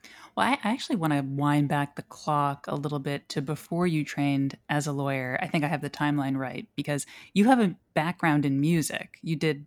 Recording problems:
uneven, jittery; strongly; from 2 to 8 s

